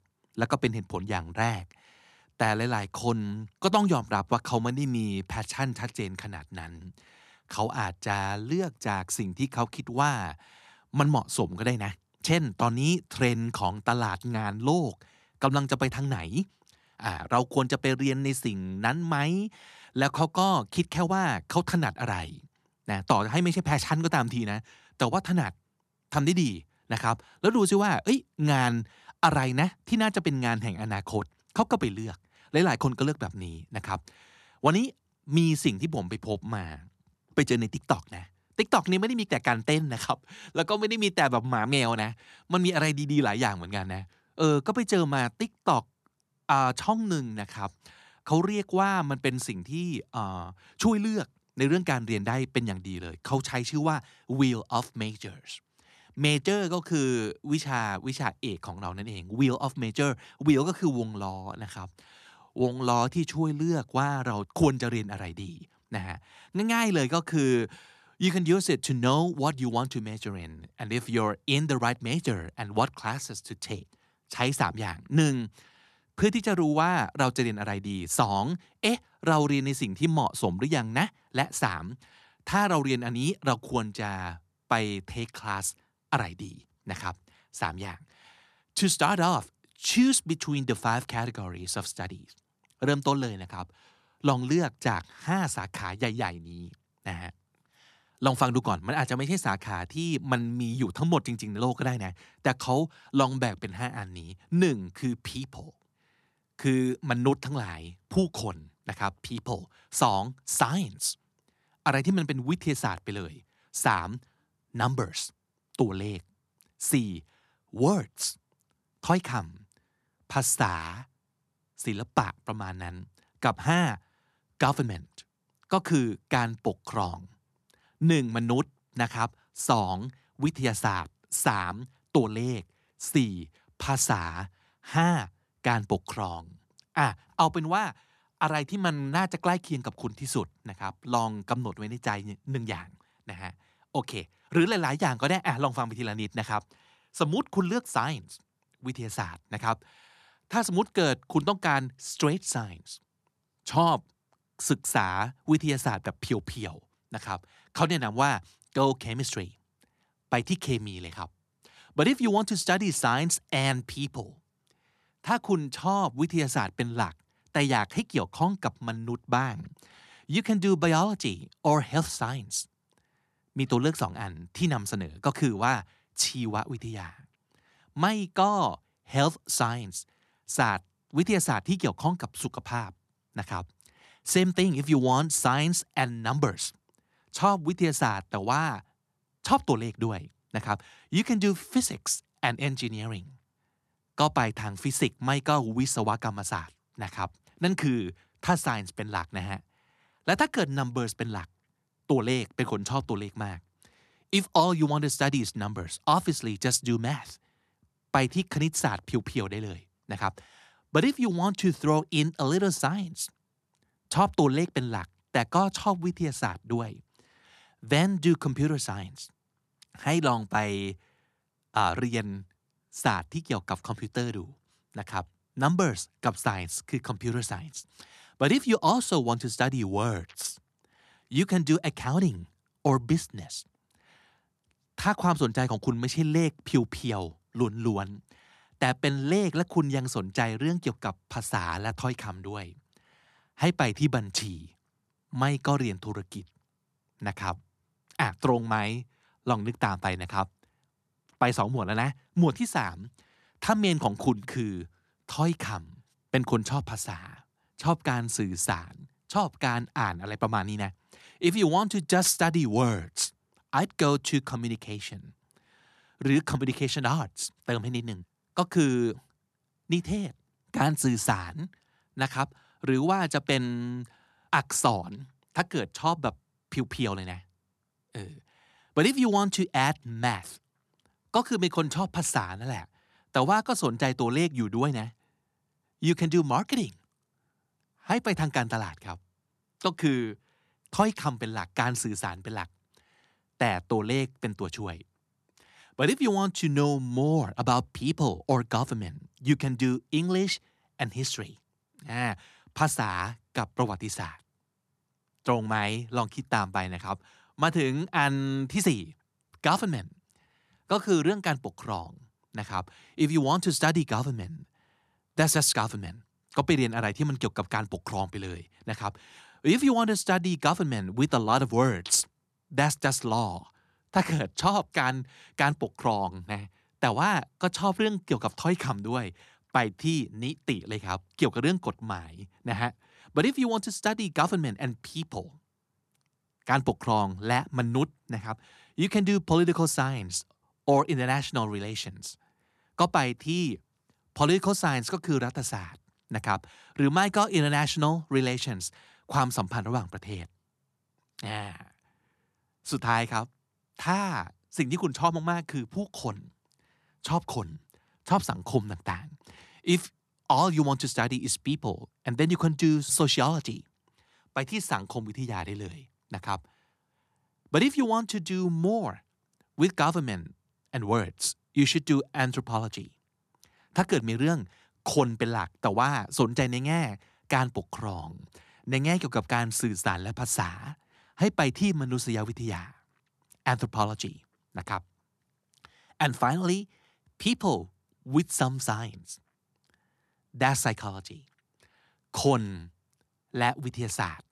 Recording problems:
none

